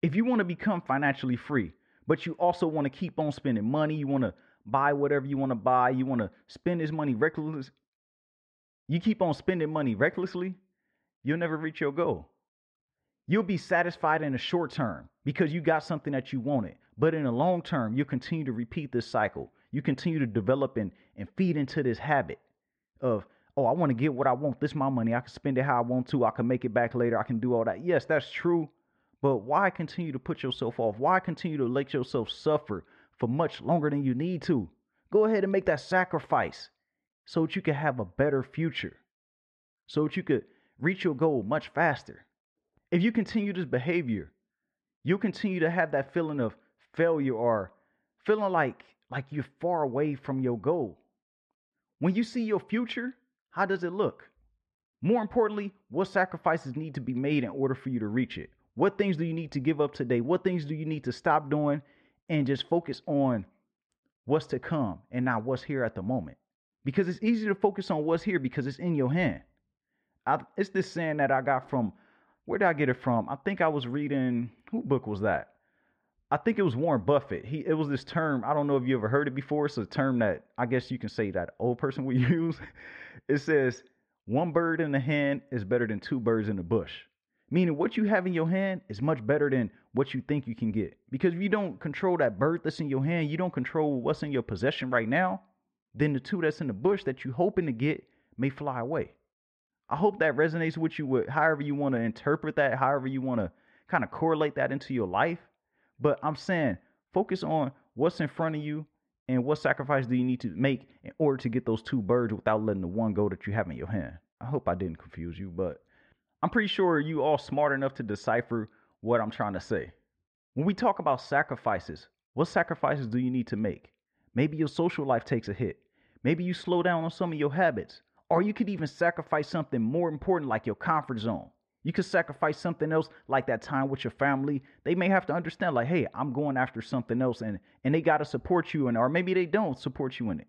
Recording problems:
muffled; very; fading above 2 kHz

